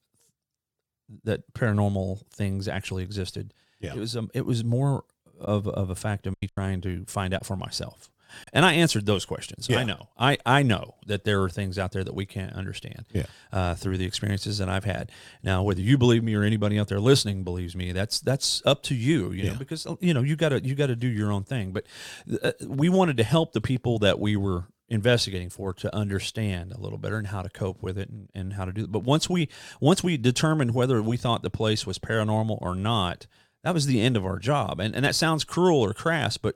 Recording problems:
choppy; very; from 5.5 to 8.5 s; 6% of the speech affected

